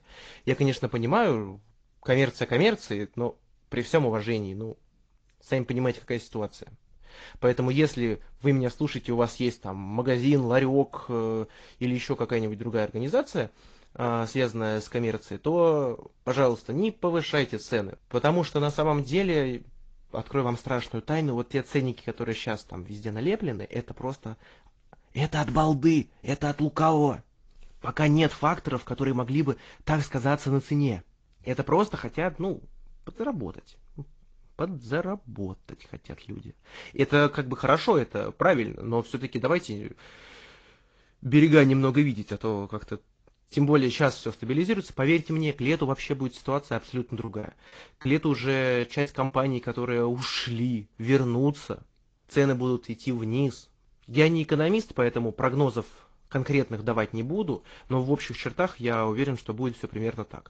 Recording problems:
garbled, watery; slightly; nothing above 7.5 kHz
choppy; very; from 47 to 49 s; 7% of the speech affected

